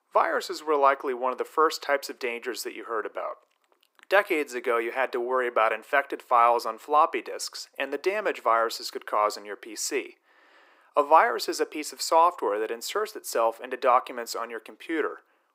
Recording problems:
thin; very; fading below 350 Hz

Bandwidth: 15.5 kHz